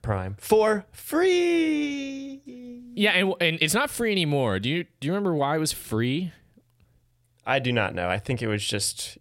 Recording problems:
none

